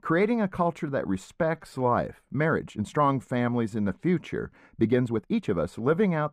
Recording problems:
muffled; very; fading above 3 kHz
uneven, jittery; strongly; from 1.5 to 5.5 s

